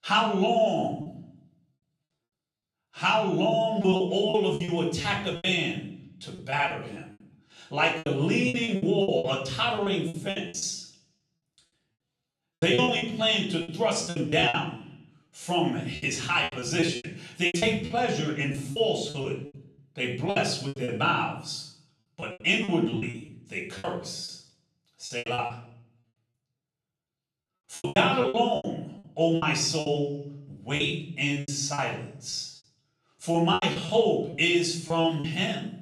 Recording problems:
off-mic speech; far
room echo; noticeable; dies away in 0.6 s
choppy; very; 15% of the speech affected

